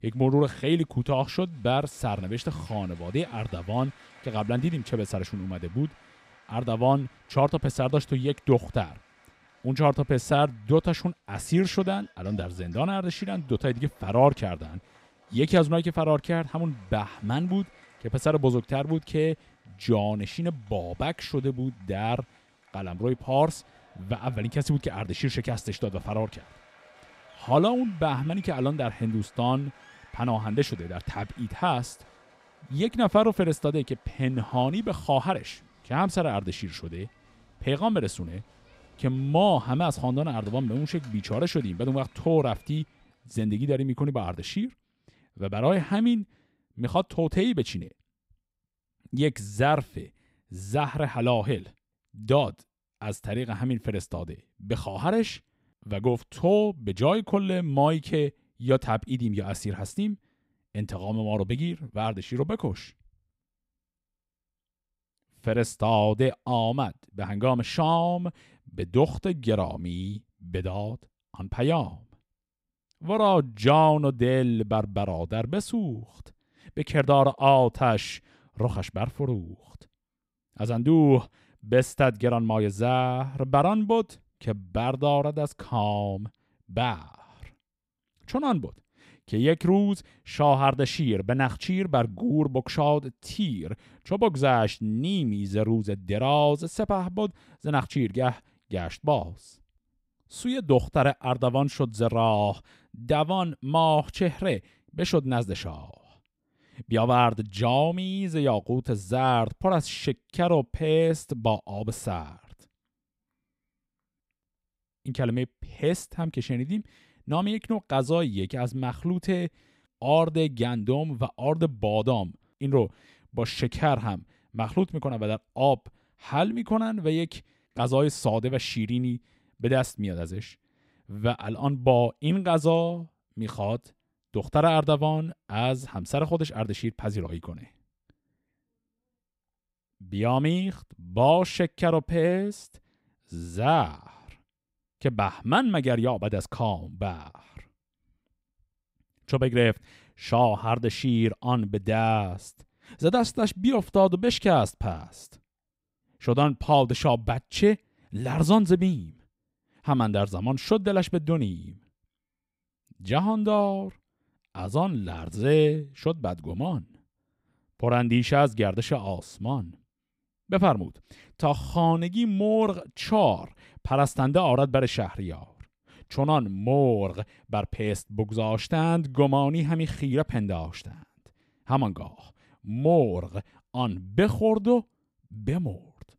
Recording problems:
crowd noise; faint; until 43 s; 30 dB below the speech

